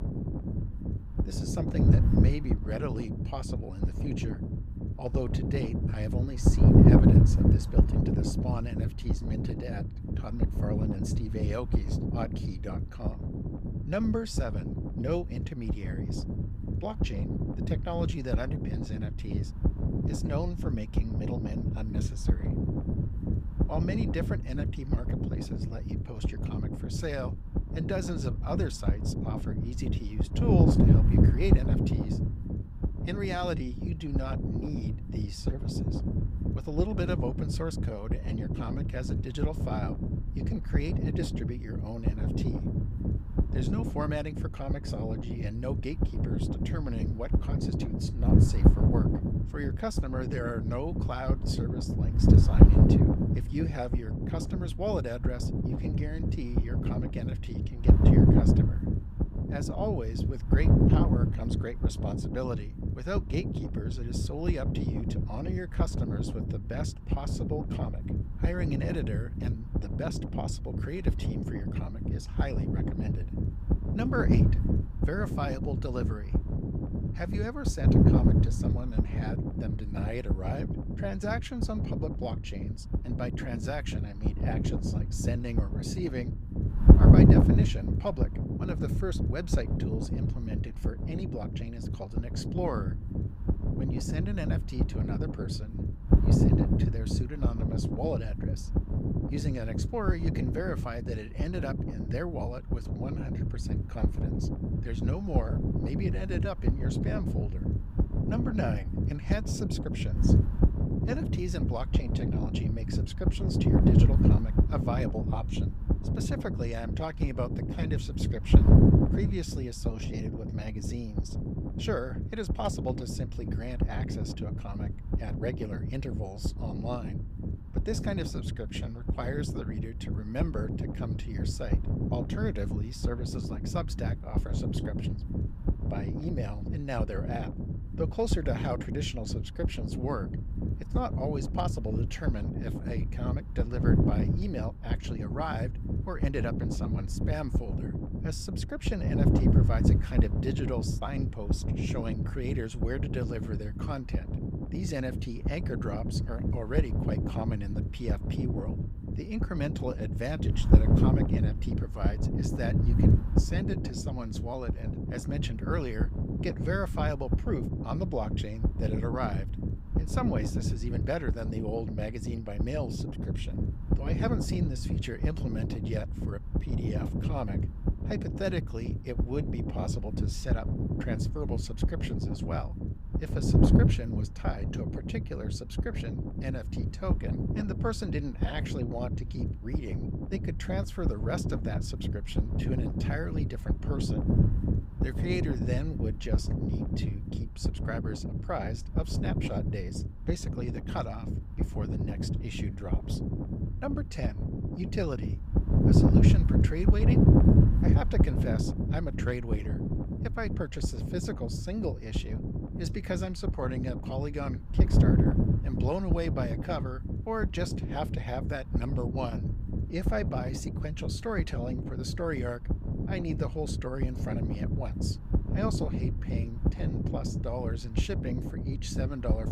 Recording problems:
wind noise on the microphone; heavy; as loud as the speech

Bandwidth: 15.5 kHz